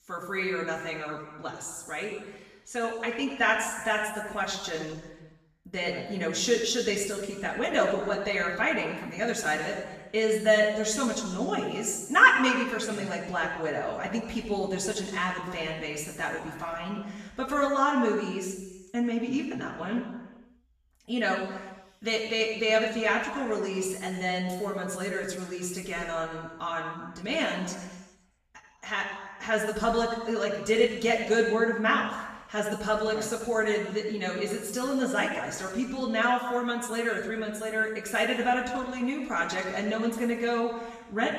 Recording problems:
off-mic speech; far
room echo; noticeable; dies away in 1.1 s

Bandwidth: 14.5 kHz